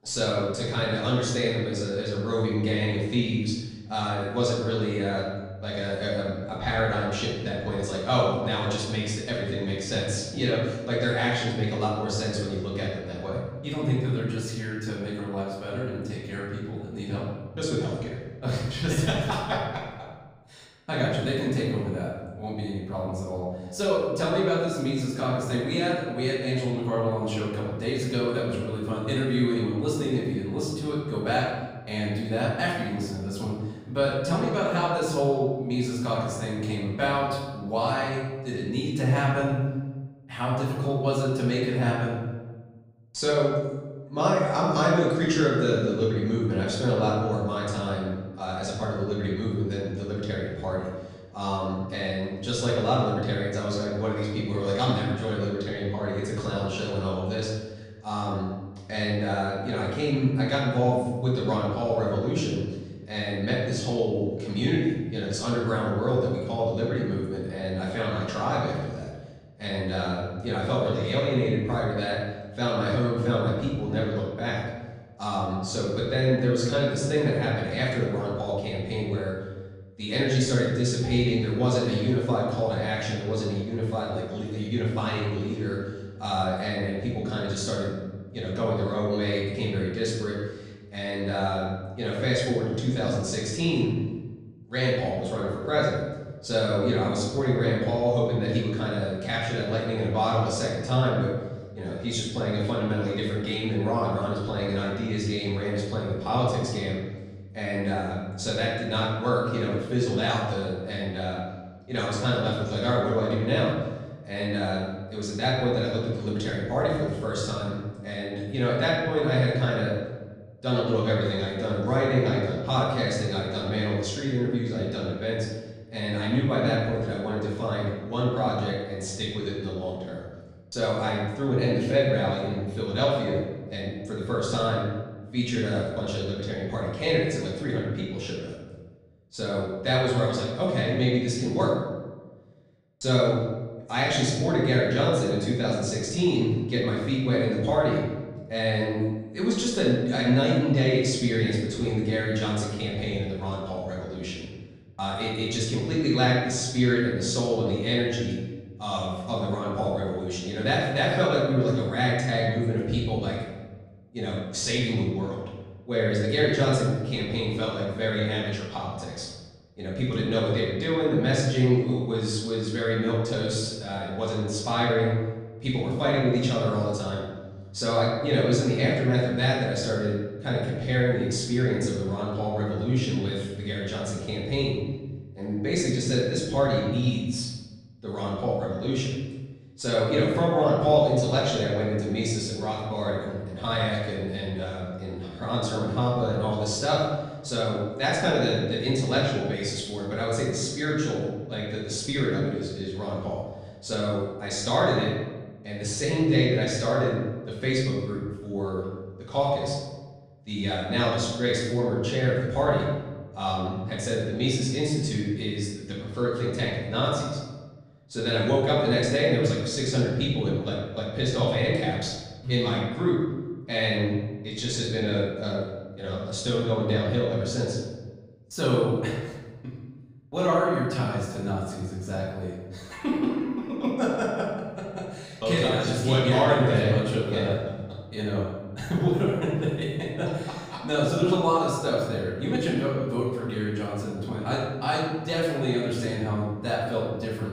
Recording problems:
off-mic speech; far
room echo; noticeable; dies away in 1.1 s

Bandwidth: 15.5 kHz